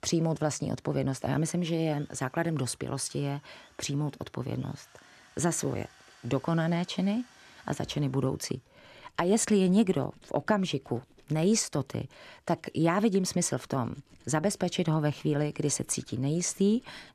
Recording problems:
machinery noise; faint; throughout; 30 dB below the speech

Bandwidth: 14 kHz